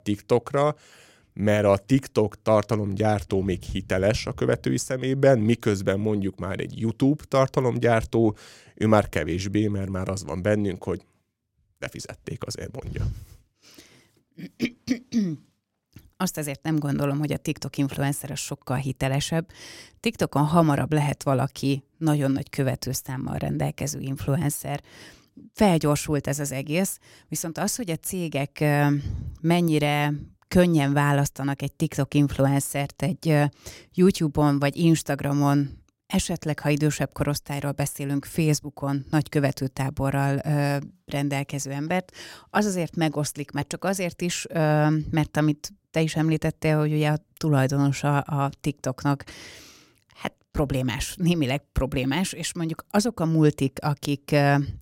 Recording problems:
none

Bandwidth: 16 kHz